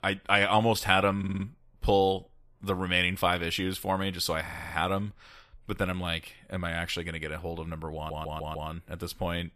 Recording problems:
audio stuttering; at 1 s, at 4.5 s and at 8 s

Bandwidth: 14.5 kHz